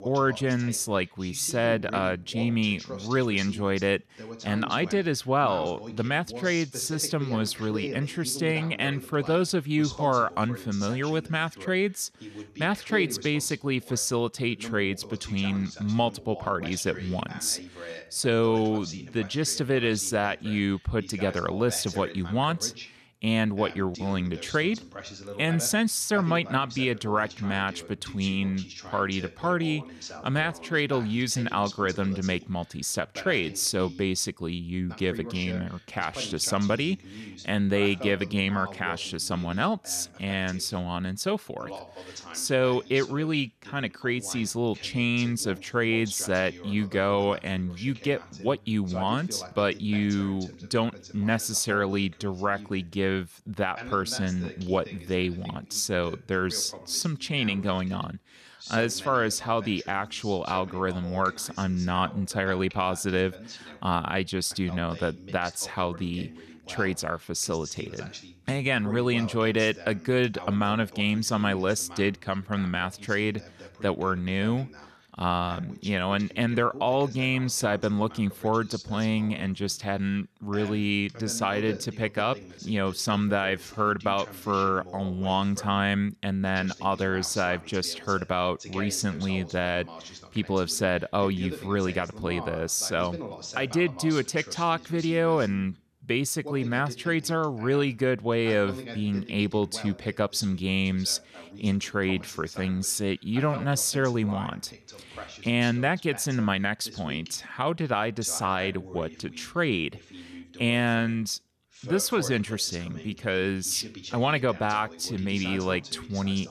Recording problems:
voice in the background; noticeable; throughout; 15 dB below the speech

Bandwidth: 13.5 kHz